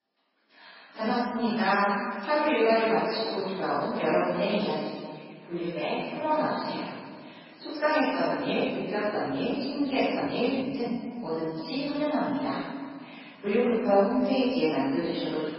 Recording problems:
room echo; strong; dies away in 1.7 s
off-mic speech; far
garbled, watery; badly; nothing above 5.5 kHz
thin; somewhat; fading below 400 Hz
uneven, jittery; strongly; from 1 to 14 s

